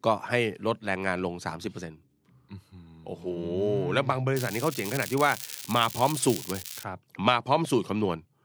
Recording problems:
crackling; loud; from 4.5 to 7 s; 9 dB below the speech

